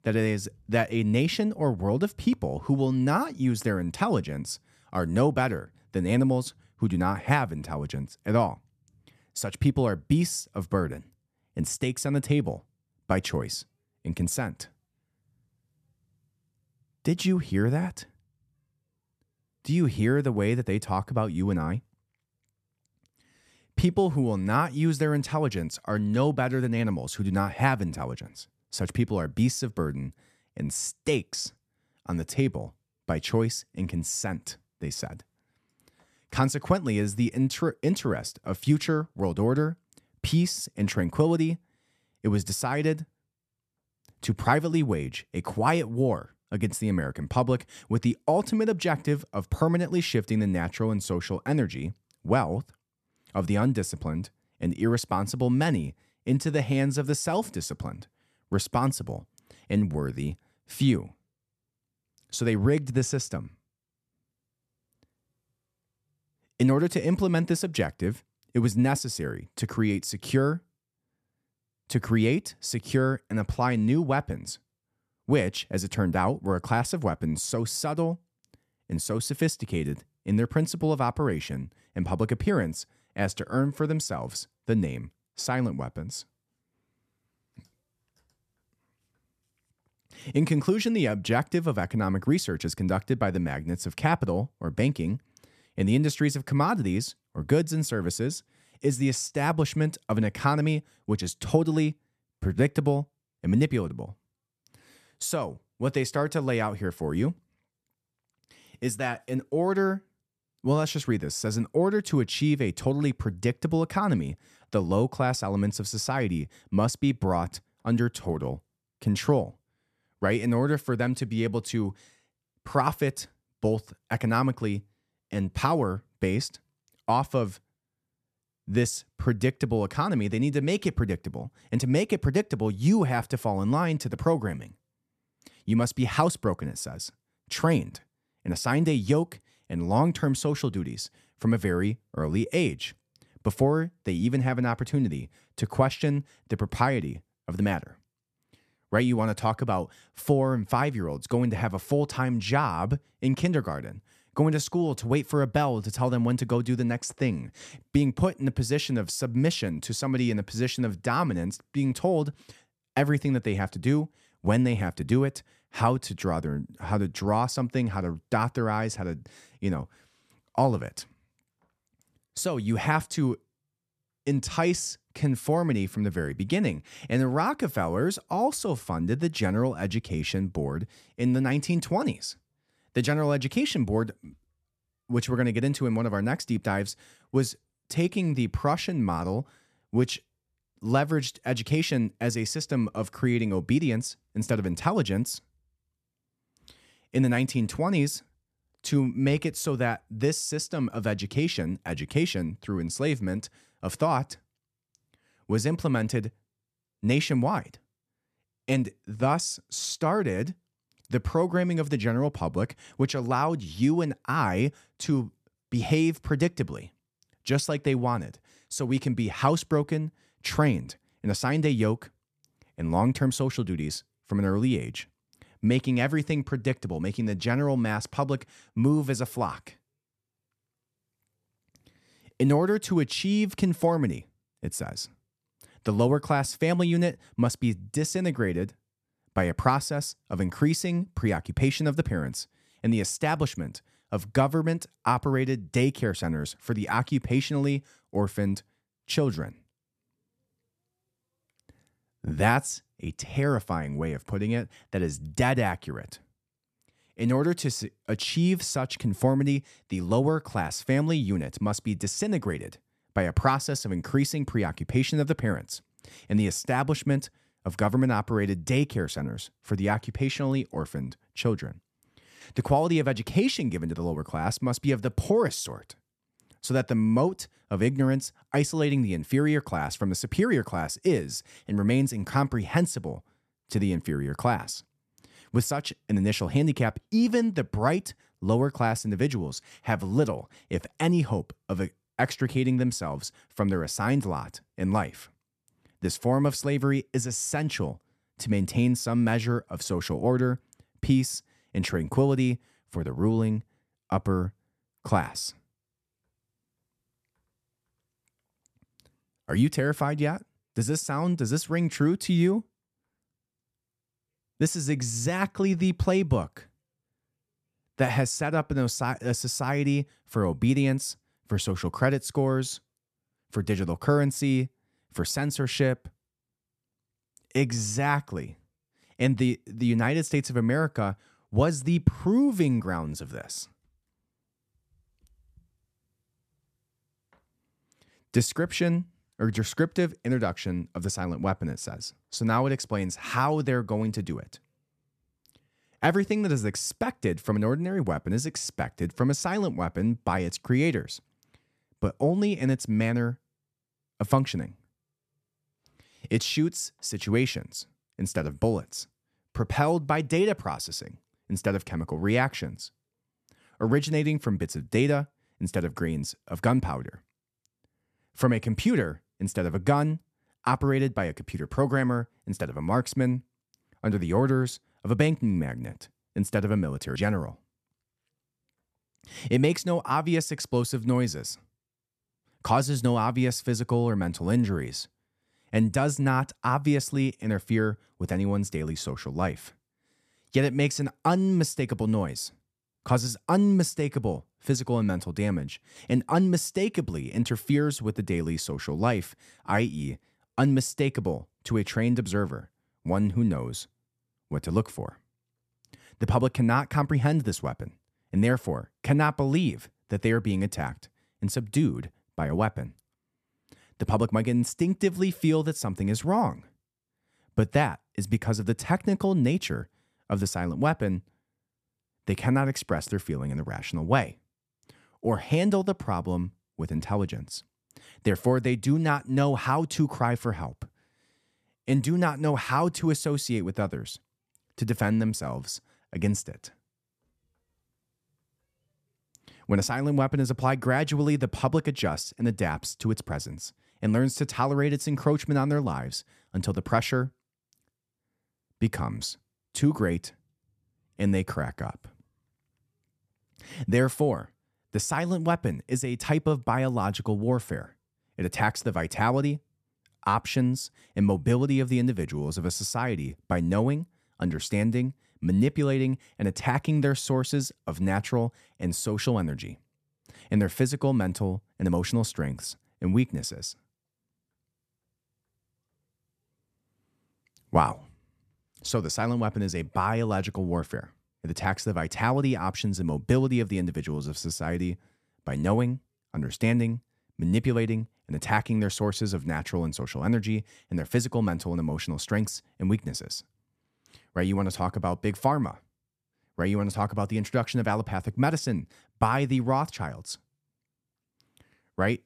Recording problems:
none

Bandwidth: 14 kHz